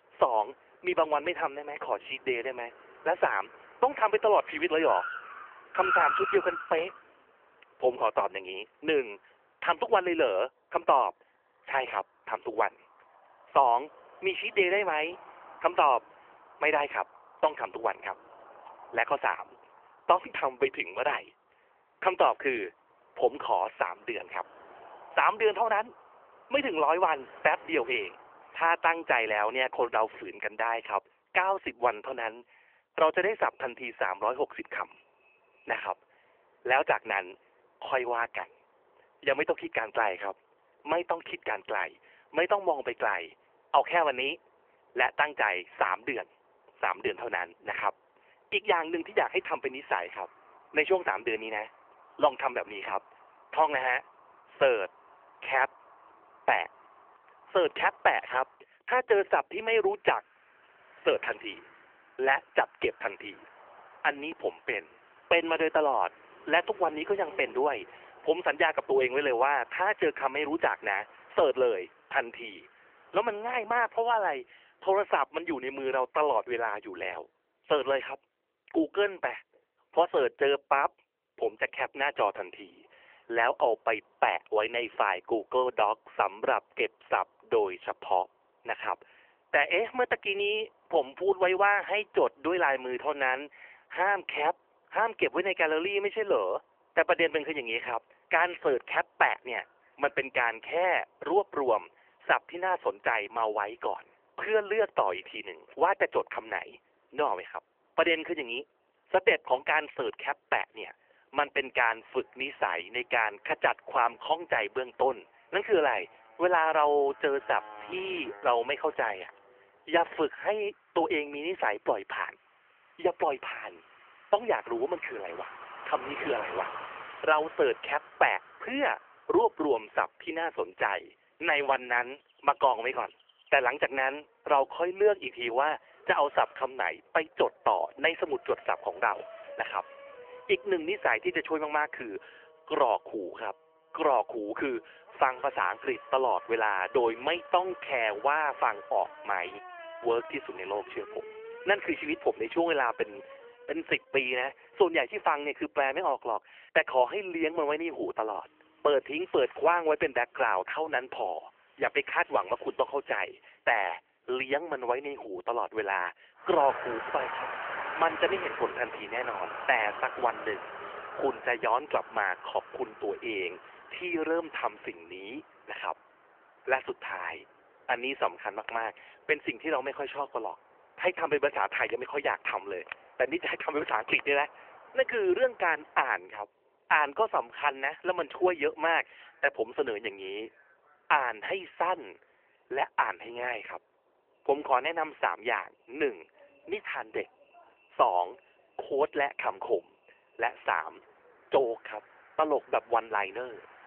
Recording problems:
phone-call audio; nothing above 3 kHz
traffic noise; noticeable; throughout; 15 dB below the speech

